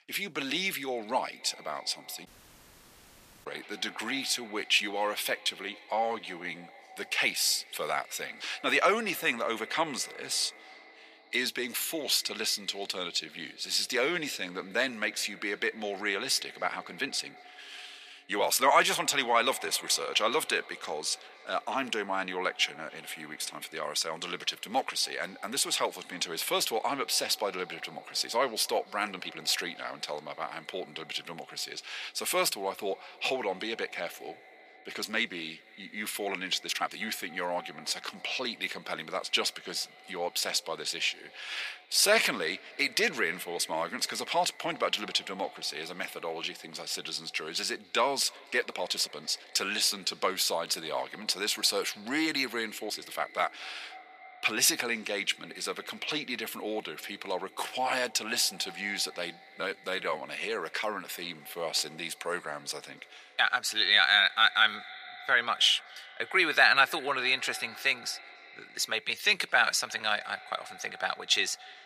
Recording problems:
thin; very; fading below 850 Hz
echo of what is said; faint; throughout; 290 ms later, 20 dB below the speech
audio cutting out; at 2.5 s for 1 s
uneven, jittery; strongly; from 4.5 s to 1:10

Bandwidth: 14.5 kHz